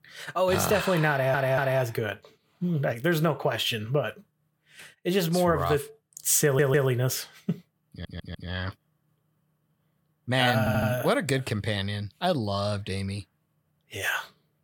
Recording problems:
audio stuttering; 4 times, first at 1 s

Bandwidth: 18 kHz